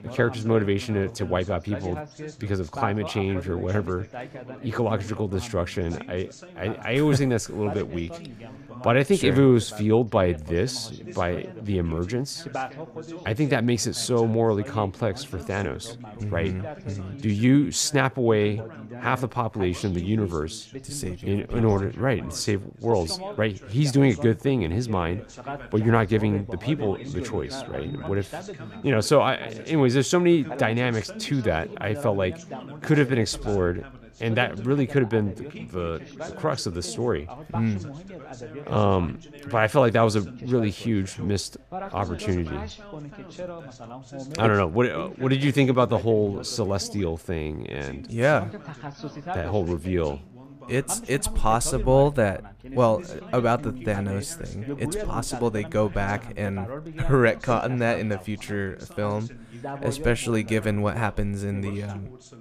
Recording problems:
background chatter; noticeable; throughout; 2 voices, 15 dB below the speech

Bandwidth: 14.5 kHz